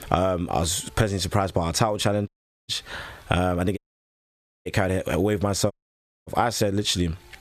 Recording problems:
squashed, flat; somewhat
audio cutting out; at 2.5 s, at 4 s for 1 s and at 5.5 s for 0.5 s

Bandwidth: 14.5 kHz